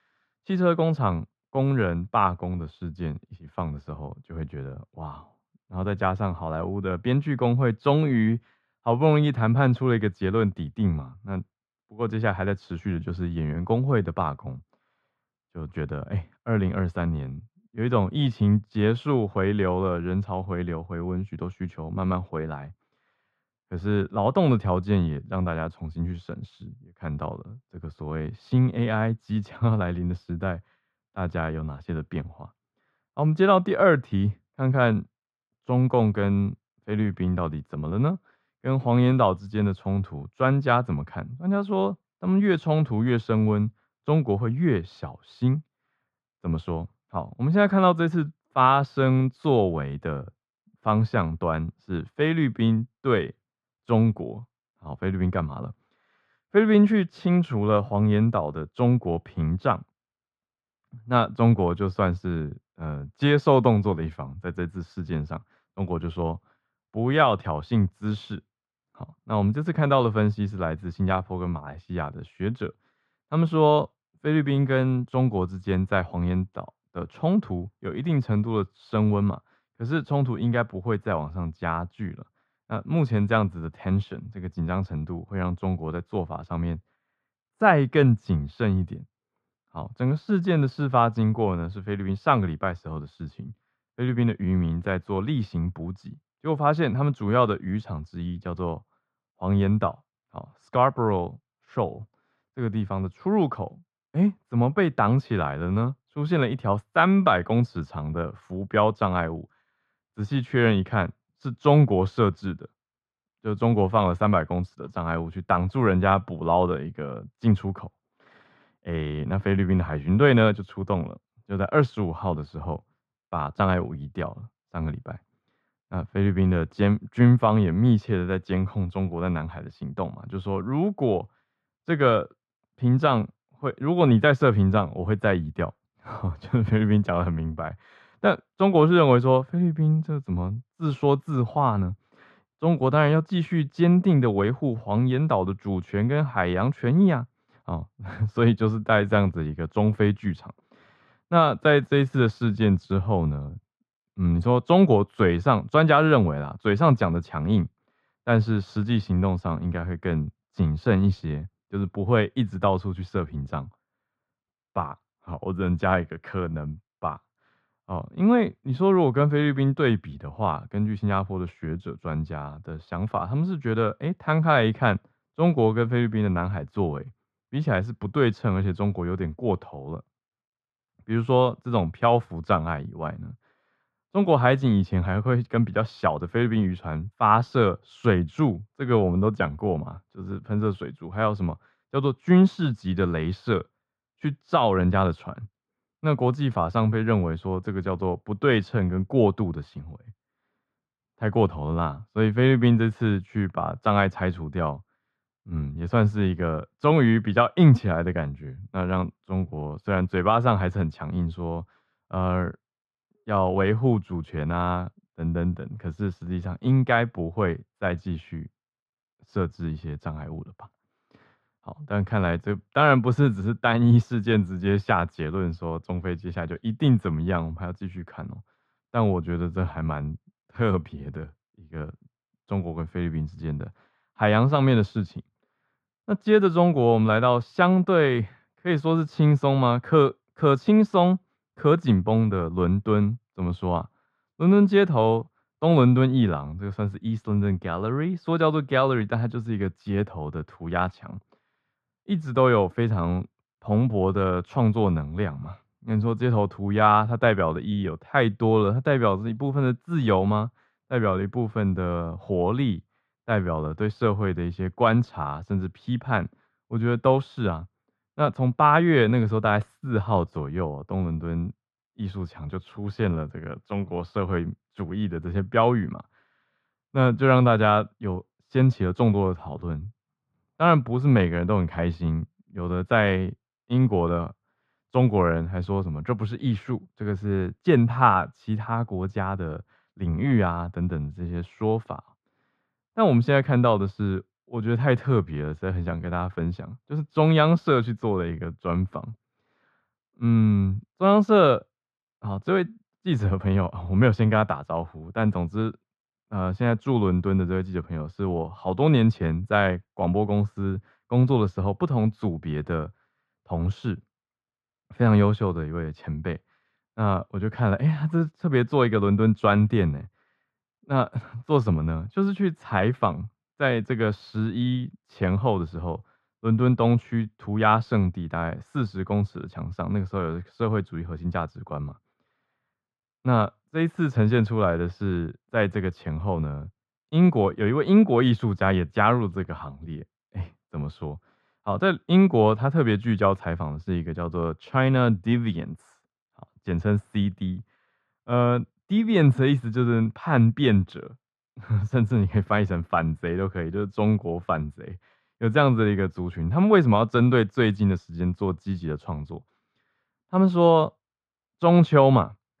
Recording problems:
muffled; very; fading above 3.5 kHz

